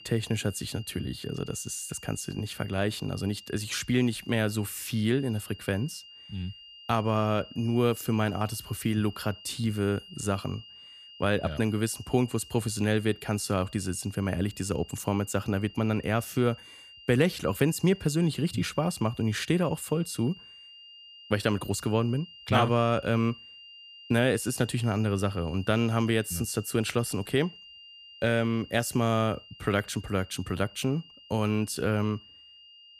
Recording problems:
high-pitched whine; noticeable; throughout; 3 kHz, 20 dB below the speech

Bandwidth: 14.5 kHz